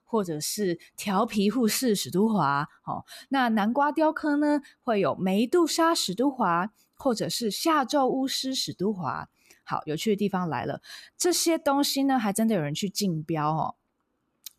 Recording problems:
none

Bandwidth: 14.5 kHz